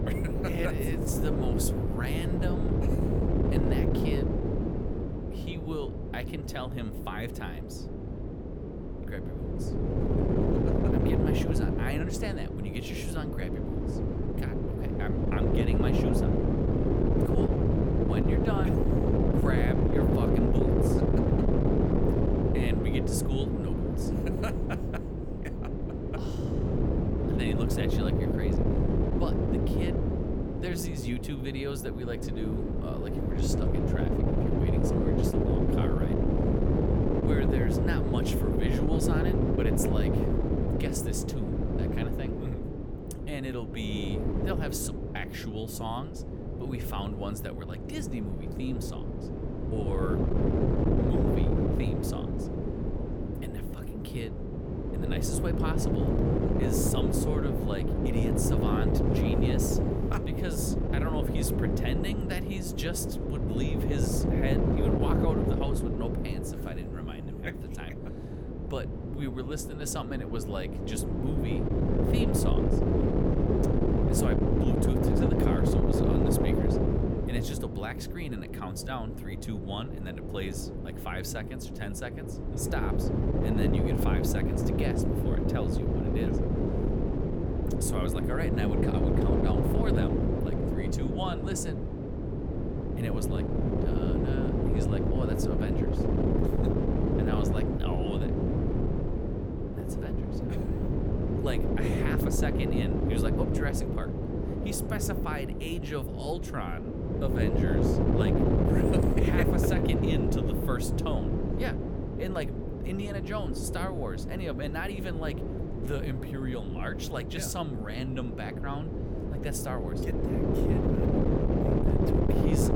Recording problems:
wind noise on the microphone; heavy; 4 dB above the speech

